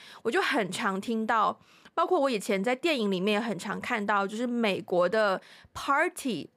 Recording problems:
none

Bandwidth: 15.5 kHz